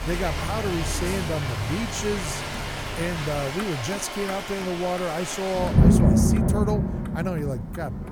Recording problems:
rain or running water; very loud; throughout; 3 dB above the speech
traffic noise; loud; throughout; 6 dB below the speech

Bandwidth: 18.5 kHz